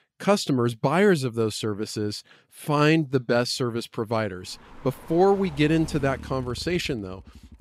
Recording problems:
traffic noise; noticeable; from 4.5 s on; 20 dB below the speech

